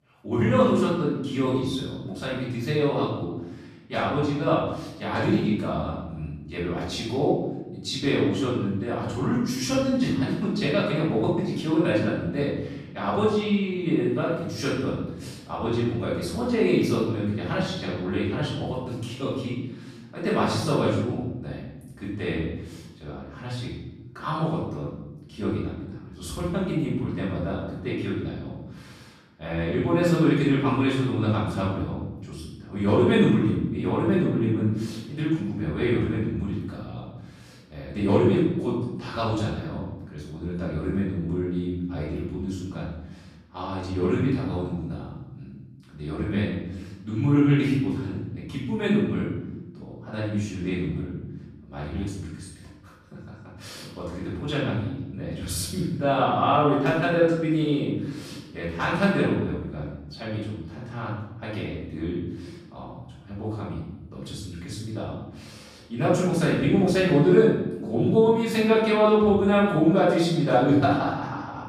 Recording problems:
off-mic speech; far
room echo; noticeable; dies away in 1 s

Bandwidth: 14 kHz